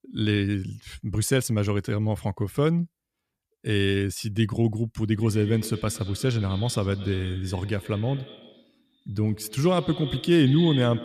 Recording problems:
echo of what is said; noticeable; from 5 s on; 110 ms later, 15 dB below the speech

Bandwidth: 14.5 kHz